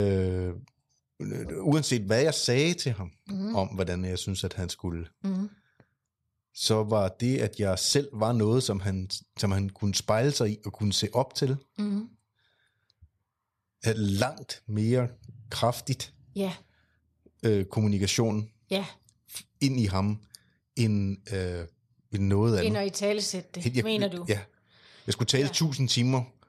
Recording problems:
abrupt cut into speech; at the start

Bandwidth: 13.5 kHz